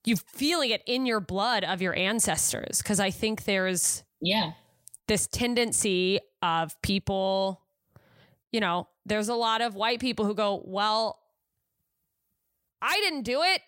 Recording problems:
none

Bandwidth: 16 kHz